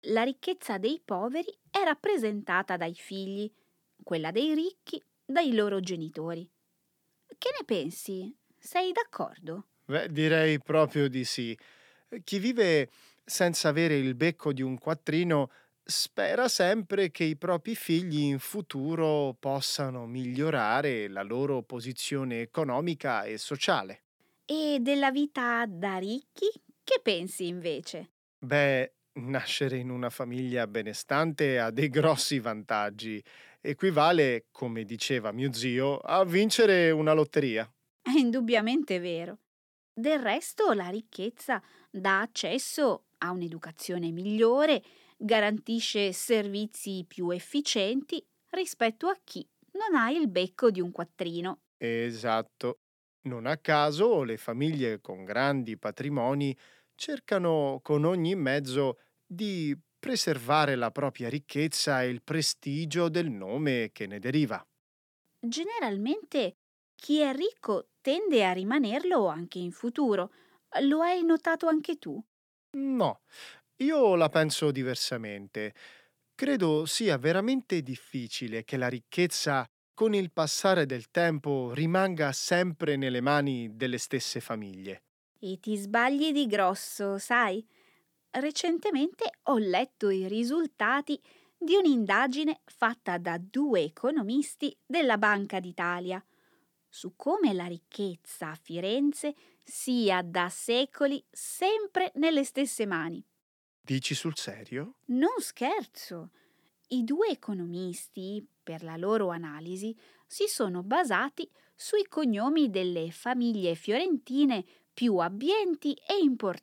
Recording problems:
none

